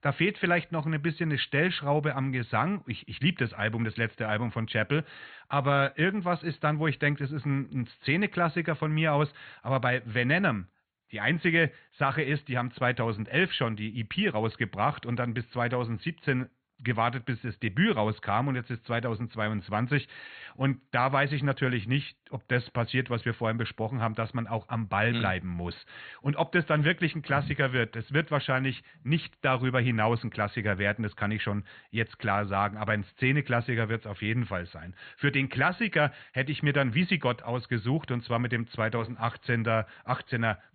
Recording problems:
high frequencies cut off; severe; nothing above 4.5 kHz

